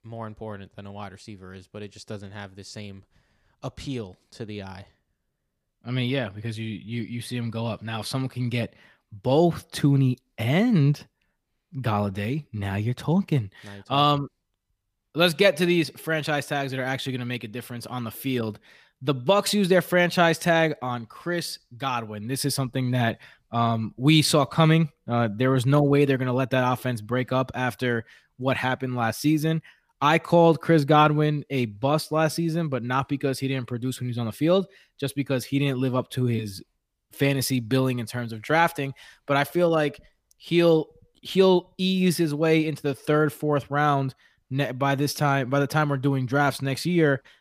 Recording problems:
none

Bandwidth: 15 kHz